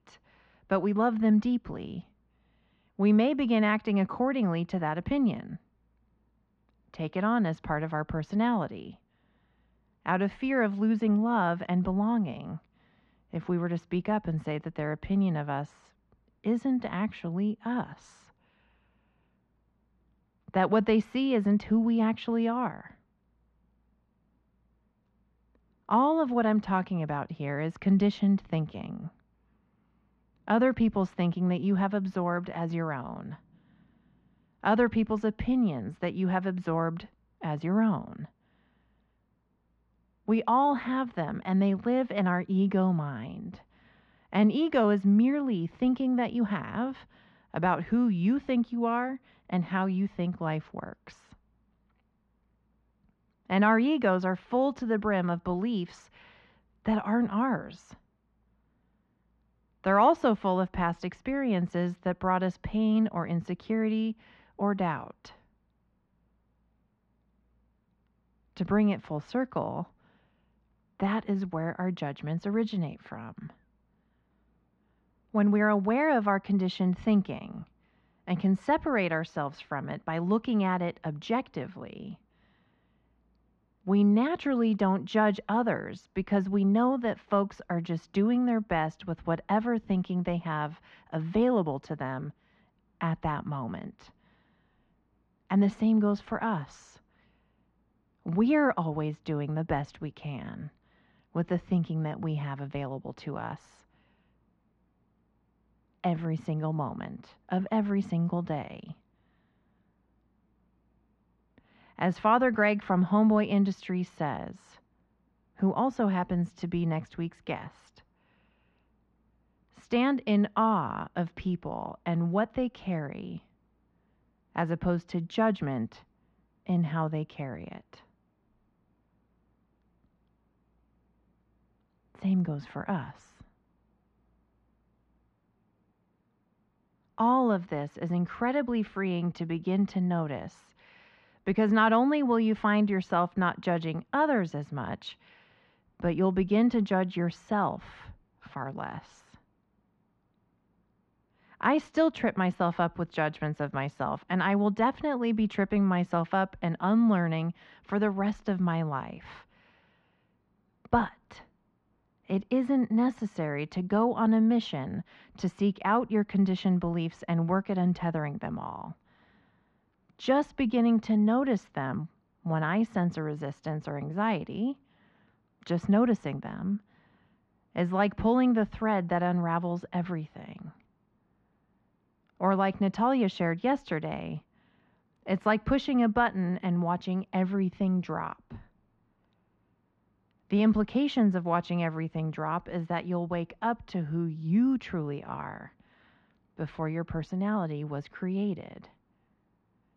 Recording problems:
muffled; very; fading above 2.5 kHz

